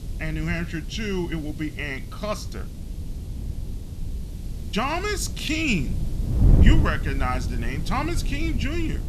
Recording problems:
wind noise on the microphone; occasional gusts; 10 dB below the speech
hiss; faint; throughout; 20 dB below the speech

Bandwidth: 13.5 kHz